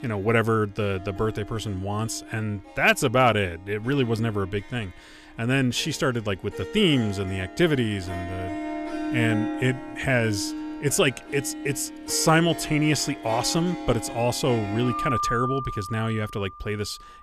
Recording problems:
background music; loud; throughout; 9 dB below the speech

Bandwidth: 14.5 kHz